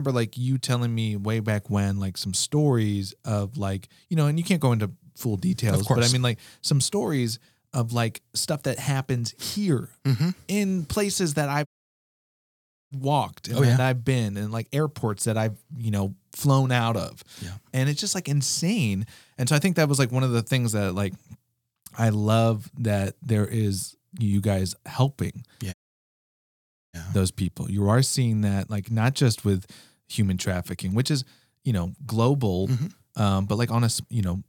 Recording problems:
abrupt cut into speech; at the start
audio cutting out; at 12 s for 1.5 s and at 26 s for 1 s

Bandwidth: 18.5 kHz